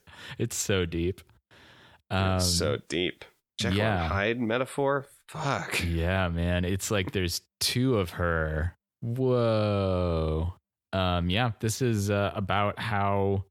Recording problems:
none

